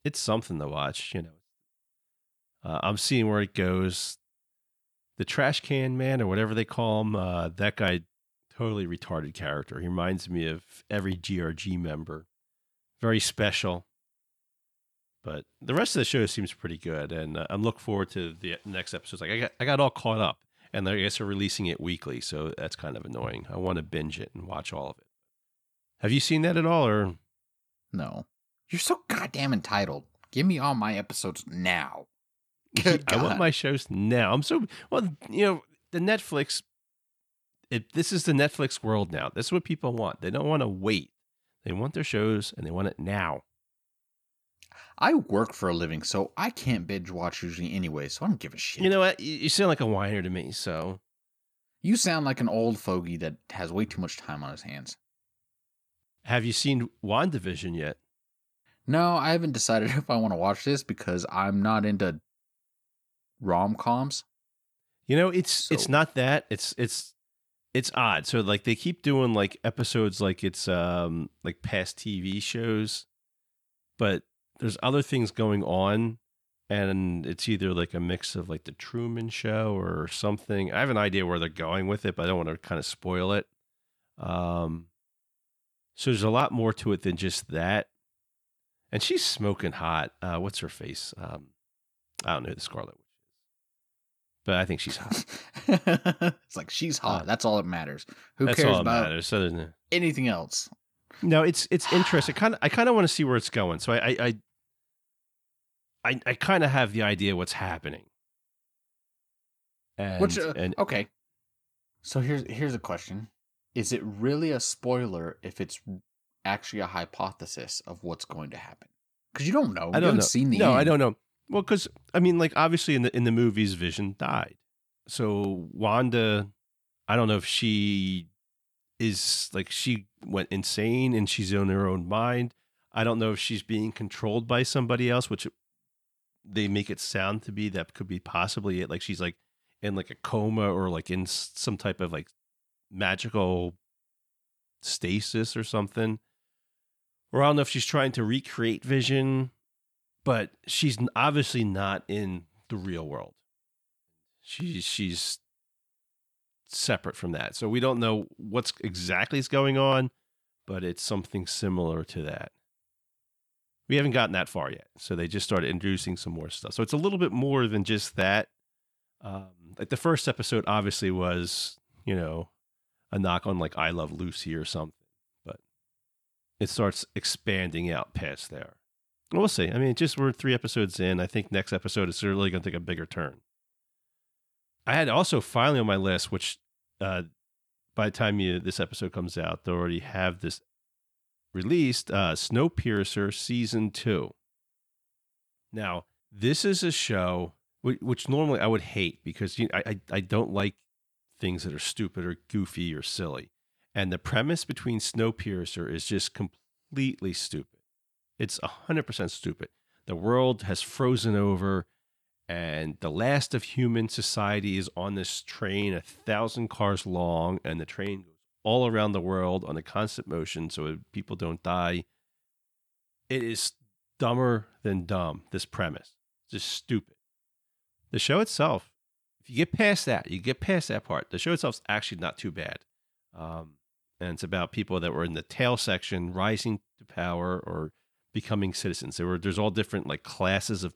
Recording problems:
none

